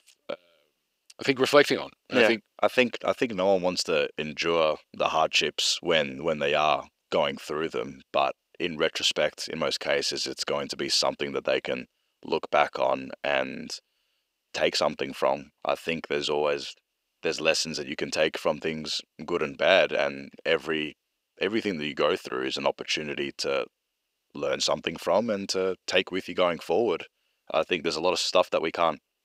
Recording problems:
thin; somewhat; fading below 400 Hz

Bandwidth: 15.5 kHz